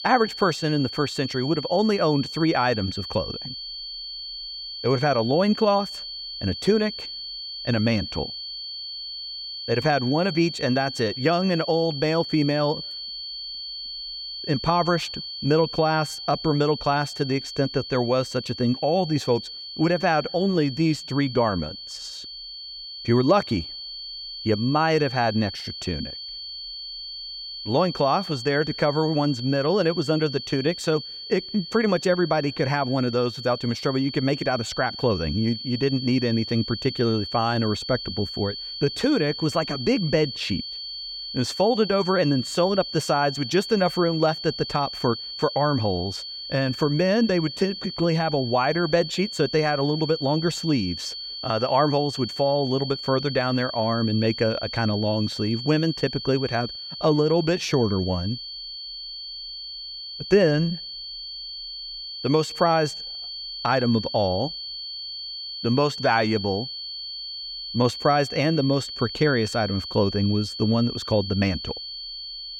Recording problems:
high-pitched whine; loud; throughout; 4.5 kHz, 8 dB below the speech

